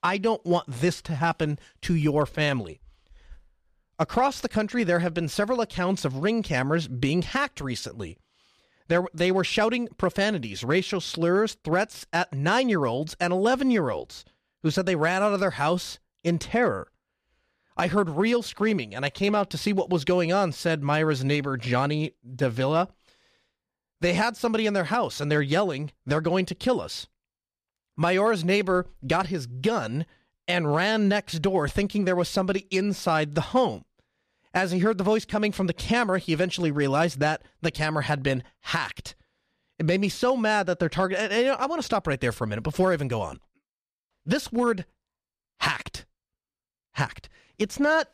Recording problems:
none

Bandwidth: 14.5 kHz